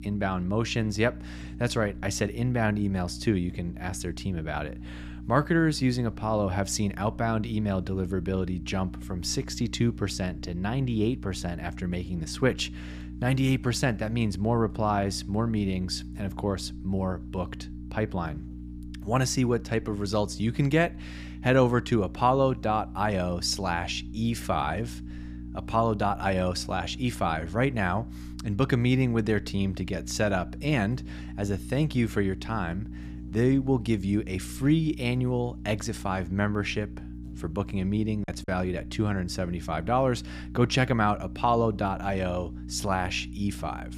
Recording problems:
electrical hum; noticeable; throughout; 60 Hz, 20 dB below the speech
choppy; occasionally; at 38 s; 3% of the speech affected

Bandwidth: 15 kHz